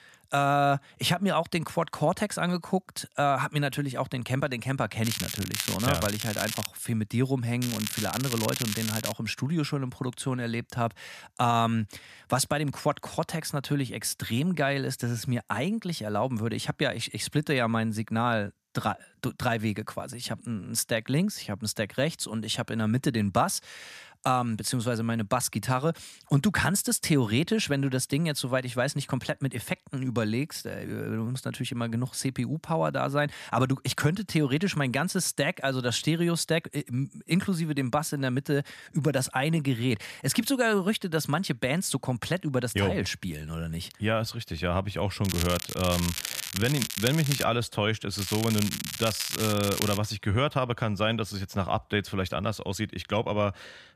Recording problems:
crackling; loud; 4 times, first at 5 s; 4 dB below the speech

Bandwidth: 14.5 kHz